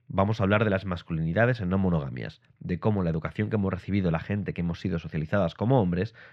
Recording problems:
muffled; slightly; fading above 2.5 kHz

